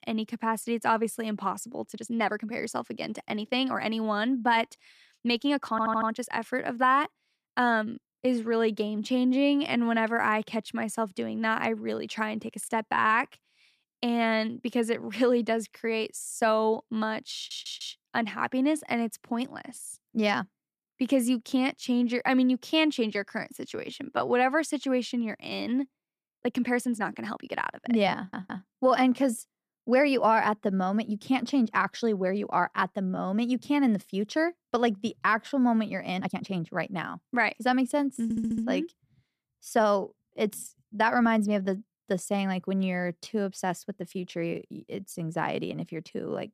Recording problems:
uneven, jittery; strongly; from 2 to 45 s
audio stuttering; 4 times, first at 5.5 s

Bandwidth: 14.5 kHz